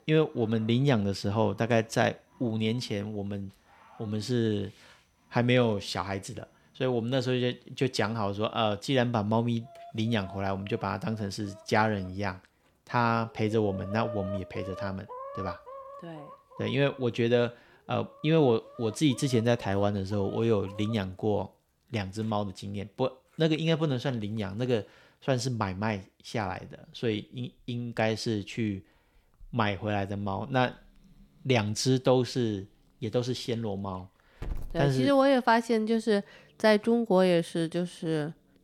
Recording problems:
animal sounds; noticeable; throughout; 15 dB below the speech

